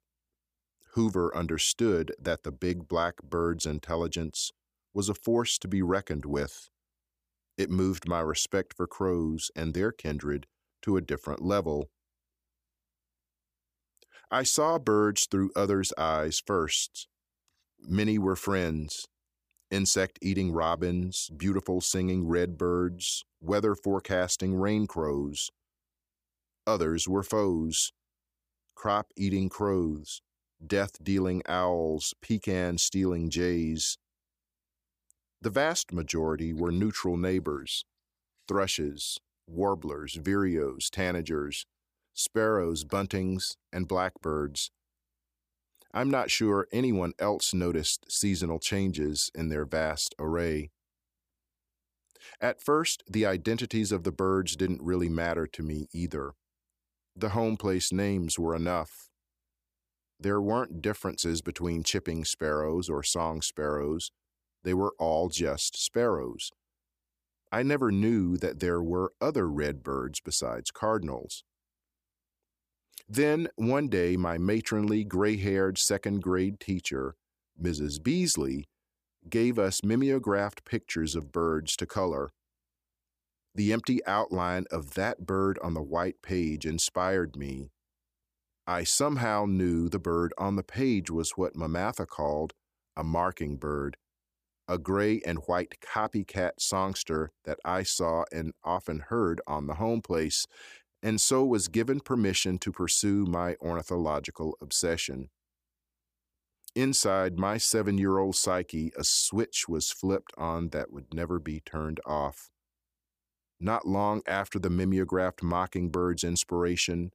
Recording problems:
none

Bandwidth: 15 kHz